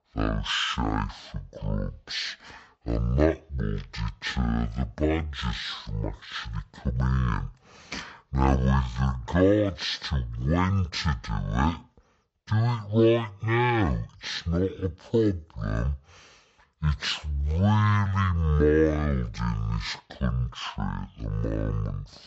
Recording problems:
wrong speed and pitch; too slow and too low; 0.5 times normal speed

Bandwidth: 8 kHz